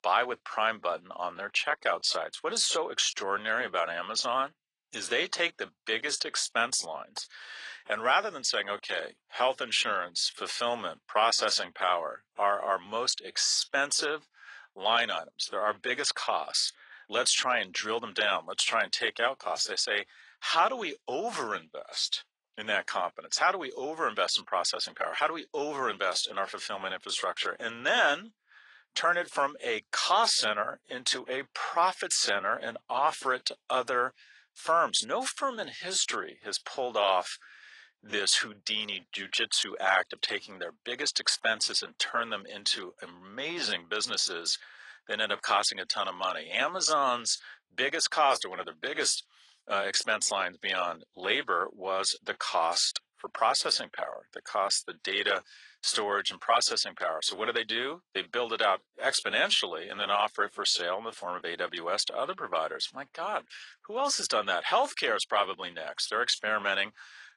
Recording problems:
thin; very; fading below 650 Hz
garbled, watery; slightly; nothing above 10 kHz

